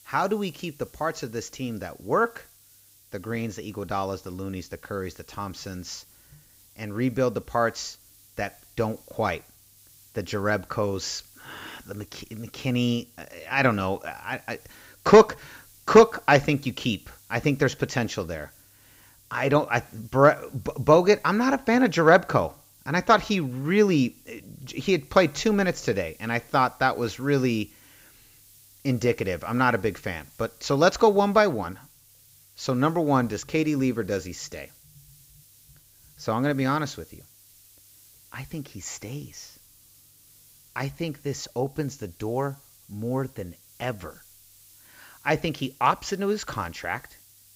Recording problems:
high frequencies cut off; noticeable; nothing above 8 kHz
hiss; faint; throughout; 25 dB below the speech

